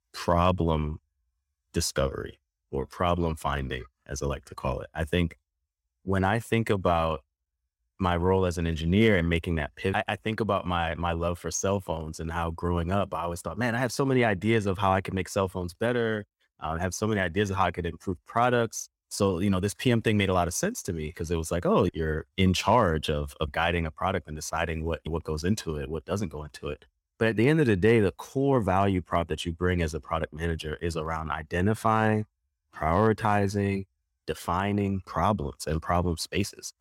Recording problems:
none

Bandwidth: 16.5 kHz